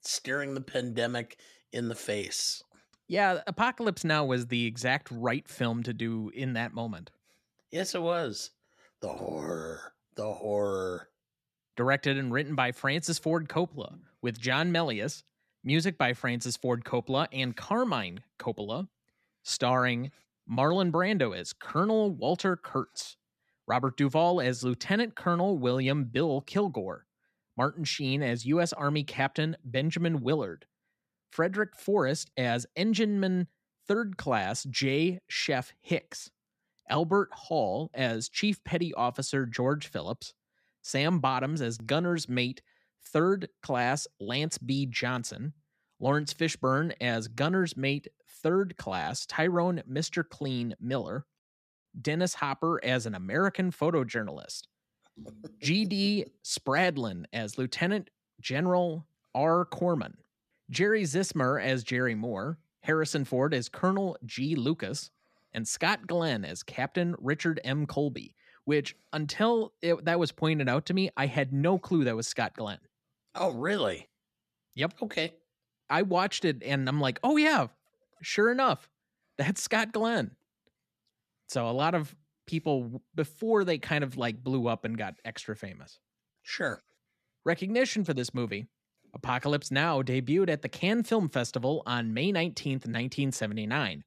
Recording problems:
none

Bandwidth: 14.5 kHz